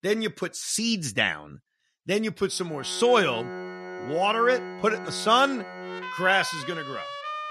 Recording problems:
background music; noticeable; from 2.5 s on; 10 dB below the speech

